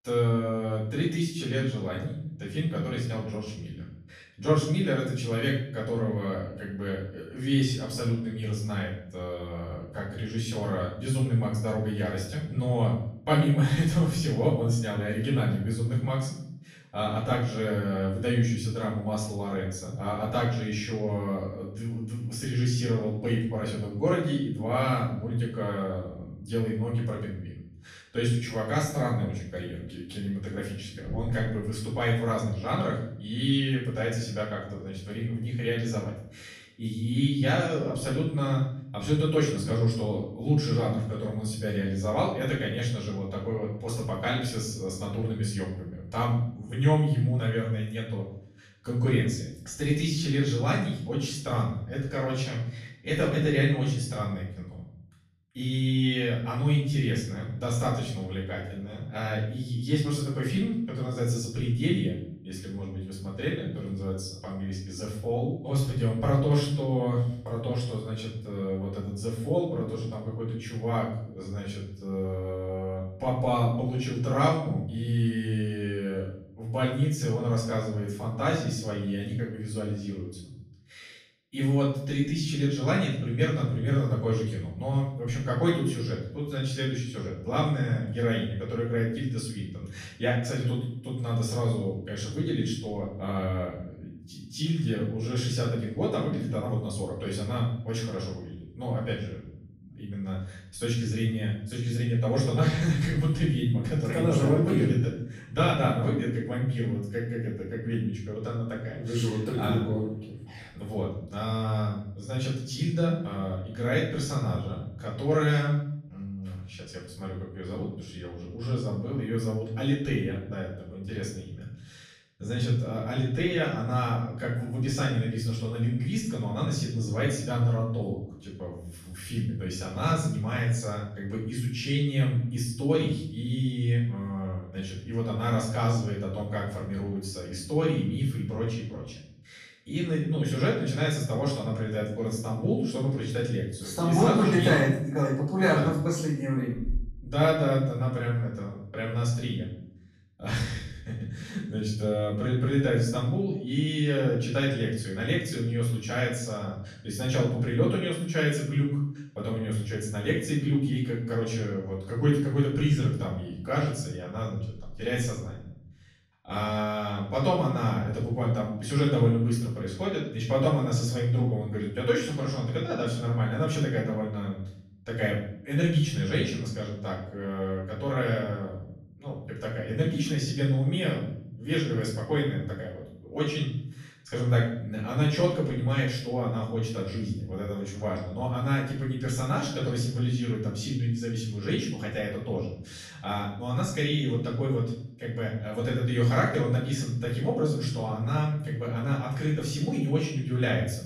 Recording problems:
off-mic speech; far
room echo; noticeable; dies away in 0.7 s

